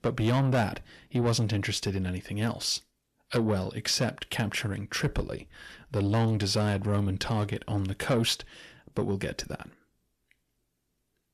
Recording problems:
distortion; slight; 10 dB below the speech

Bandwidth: 14 kHz